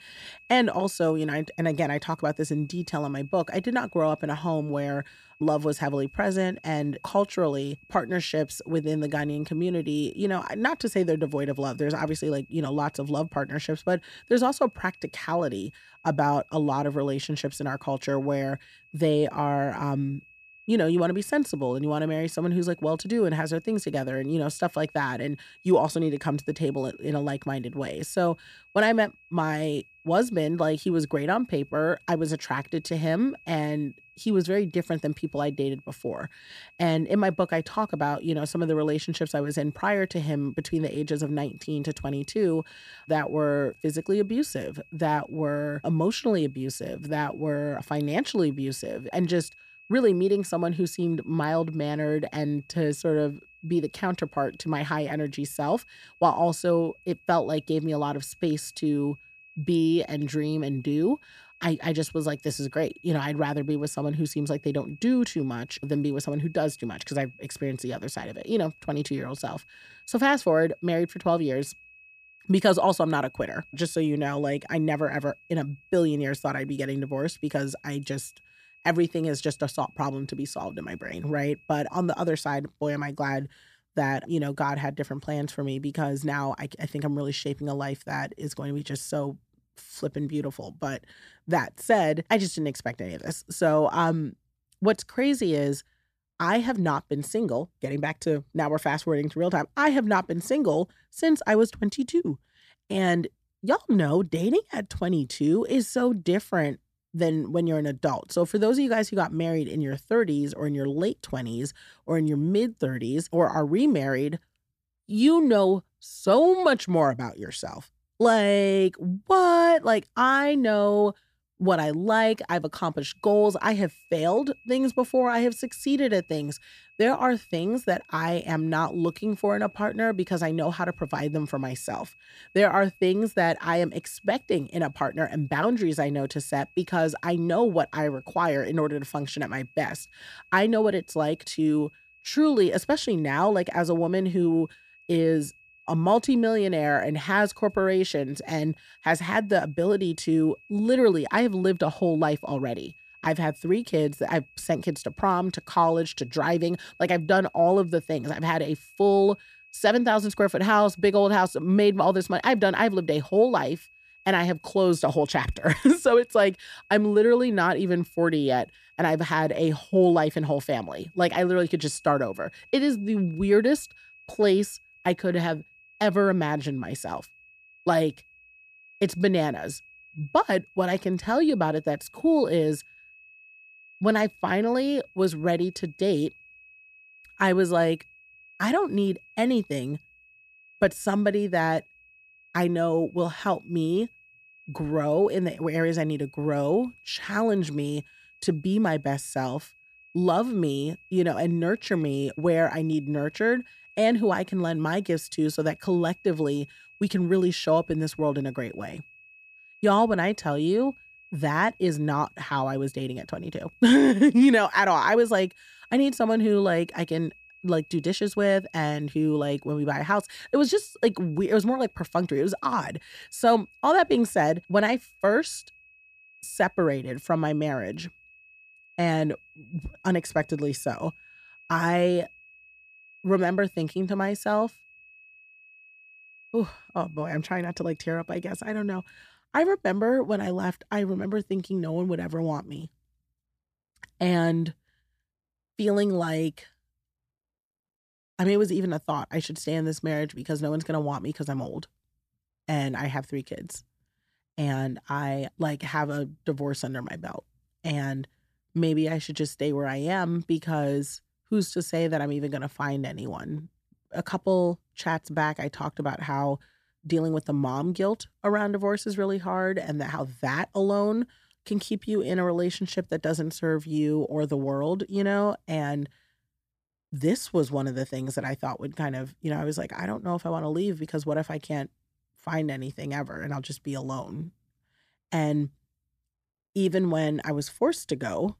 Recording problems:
high-pitched whine; faint; until 1:22 and from 2:03 to 3:59; 2.5 kHz, 25 dB below the speech

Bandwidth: 14.5 kHz